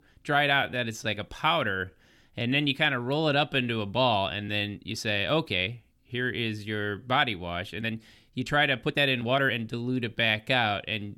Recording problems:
uneven, jittery; strongly; from 0.5 to 10 s

